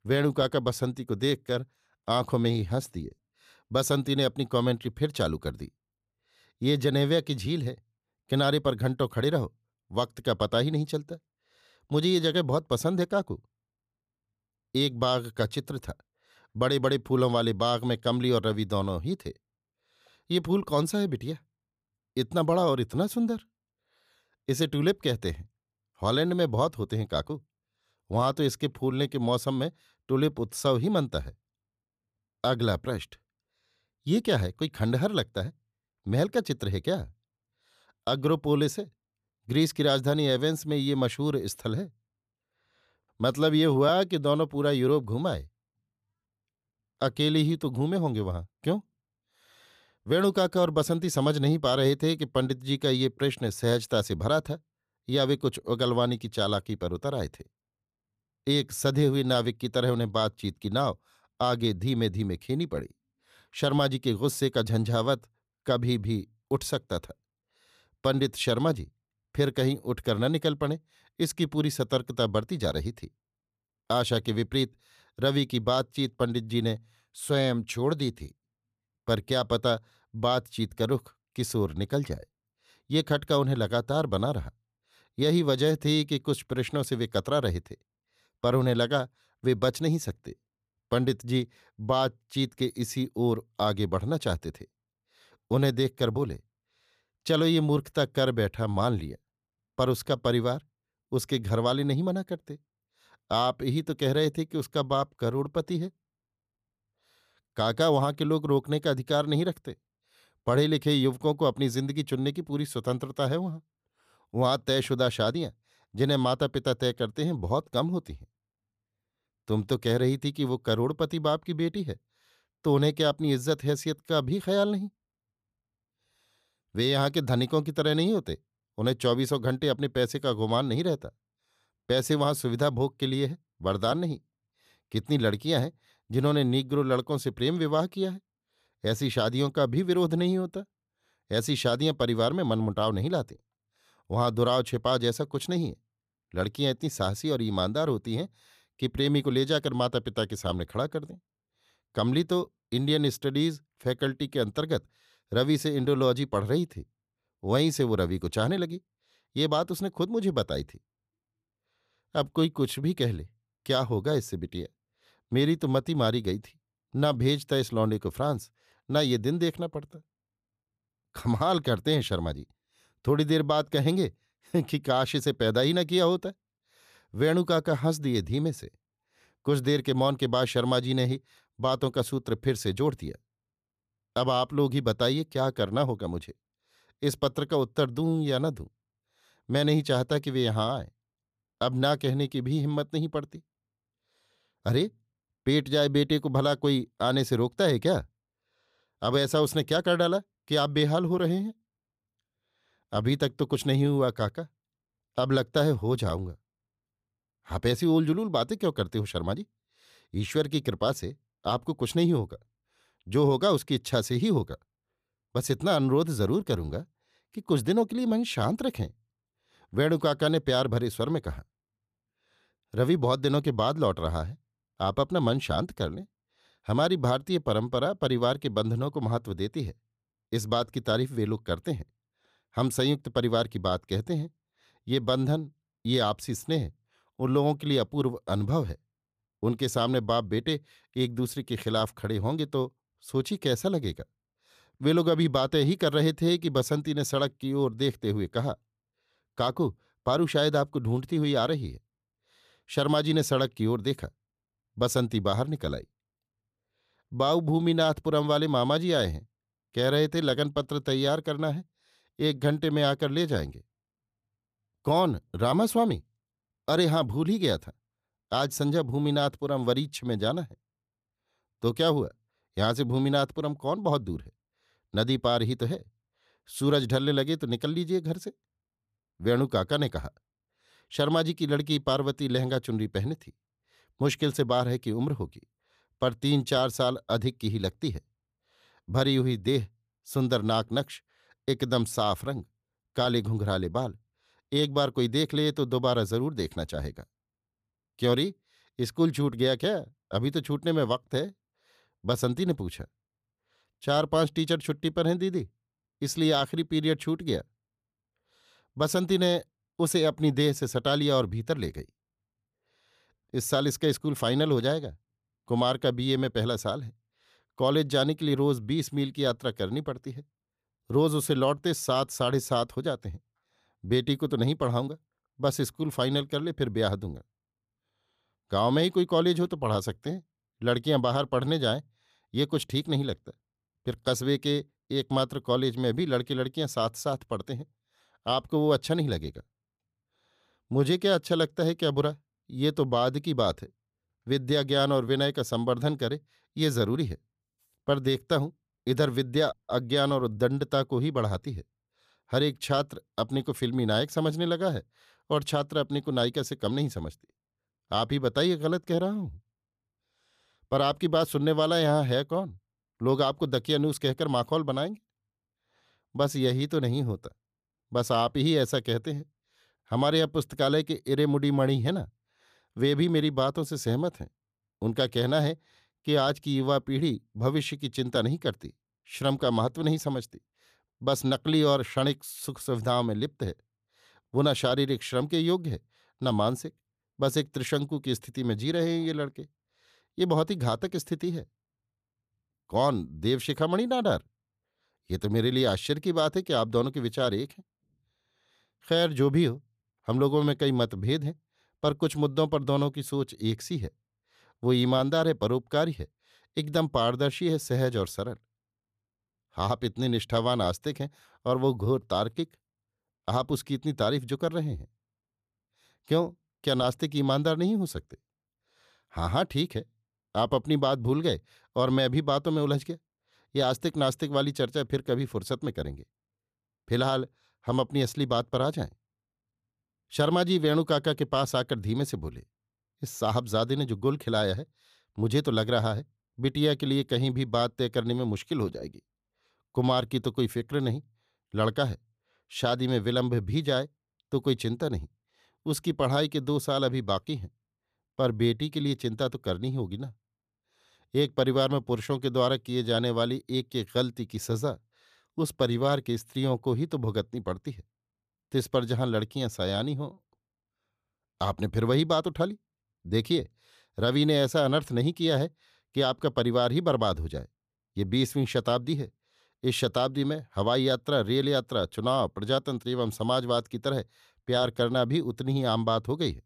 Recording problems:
none

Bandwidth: 14.5 kHz